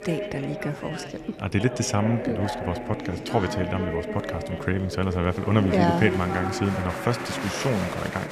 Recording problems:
chatter from many people; loud; throughout; 5 dB below the speech

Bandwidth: 14.5 kHz